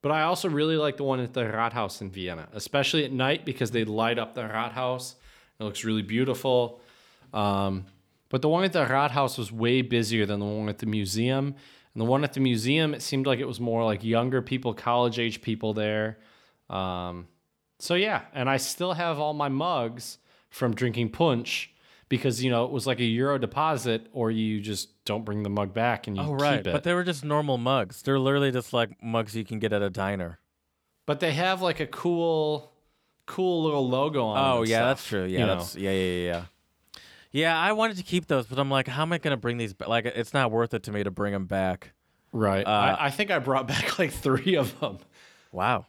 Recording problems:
none

